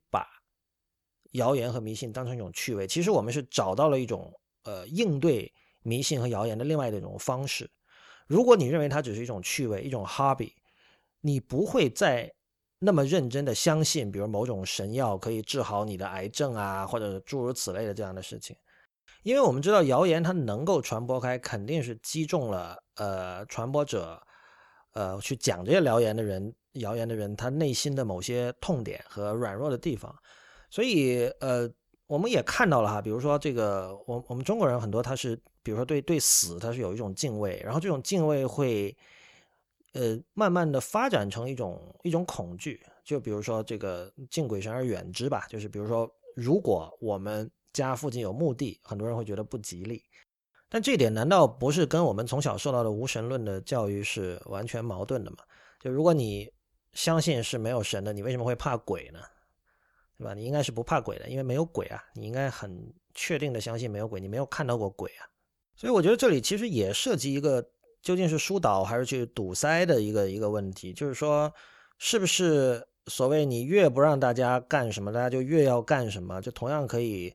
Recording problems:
none

